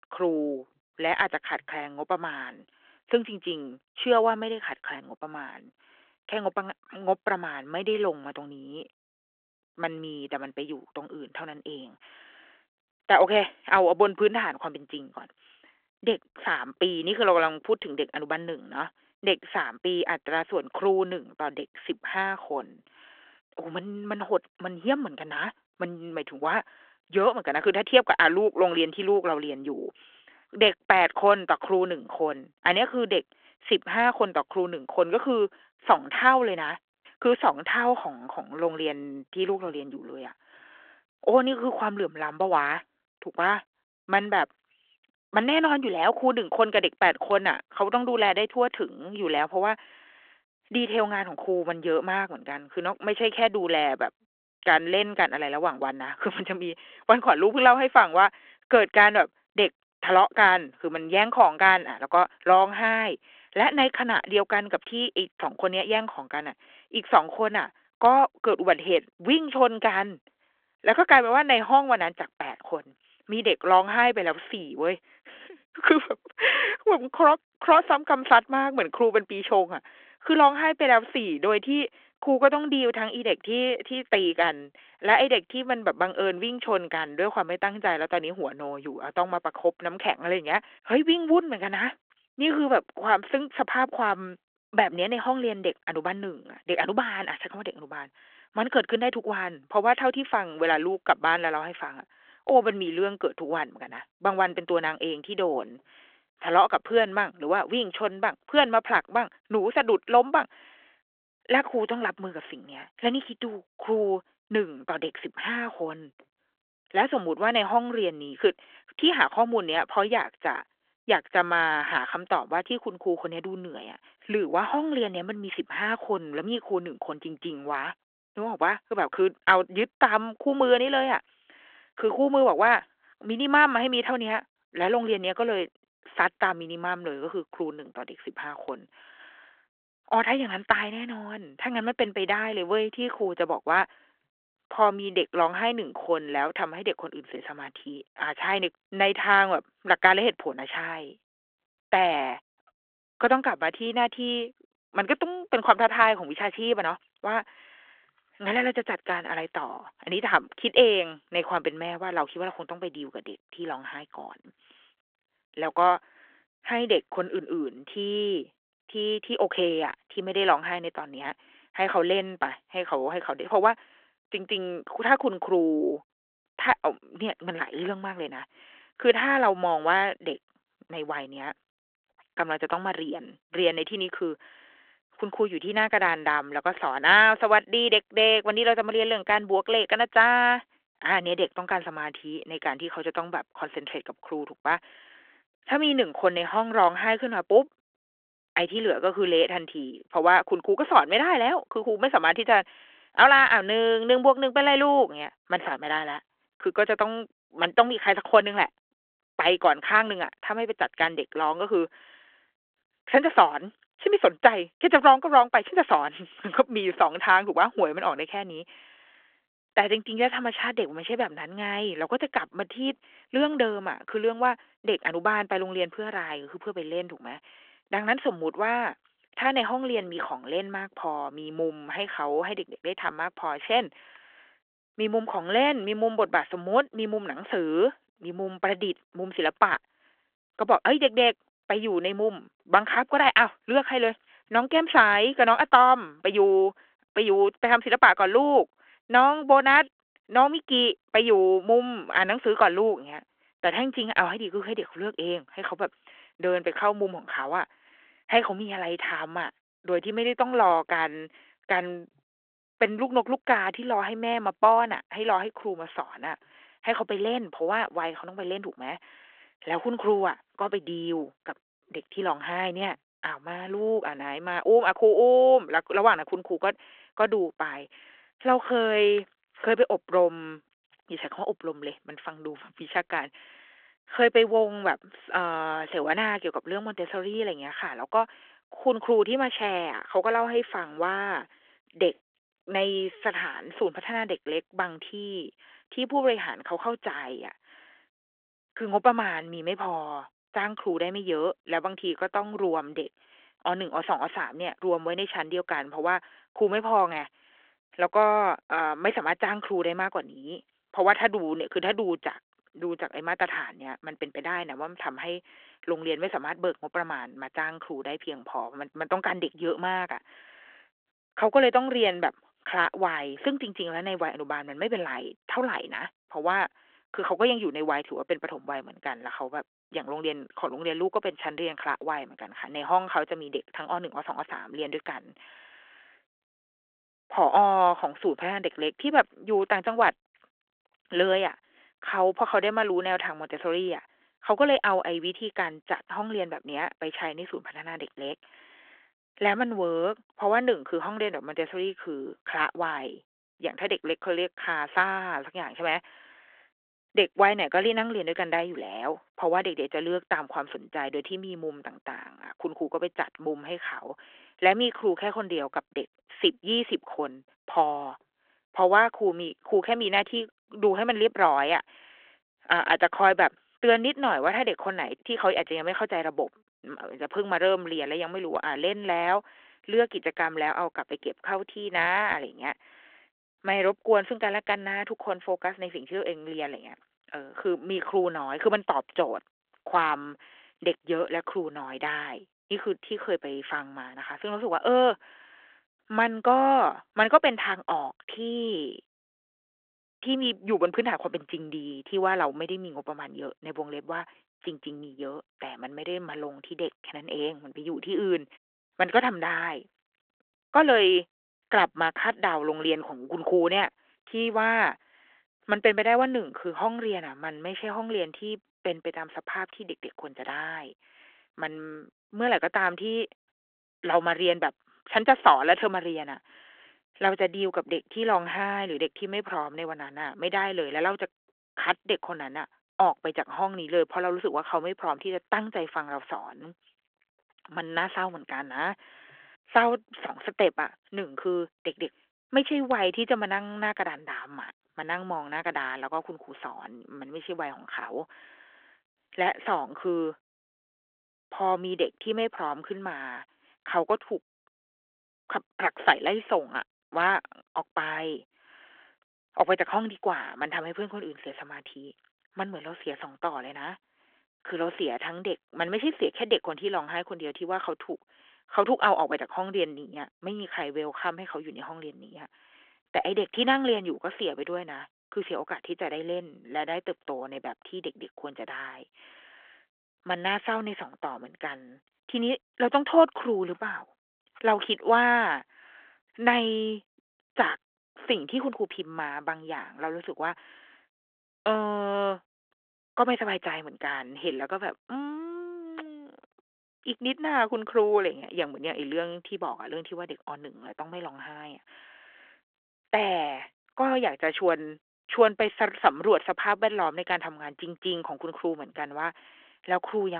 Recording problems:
phone-call audio
abrupt cut into speech; at the end

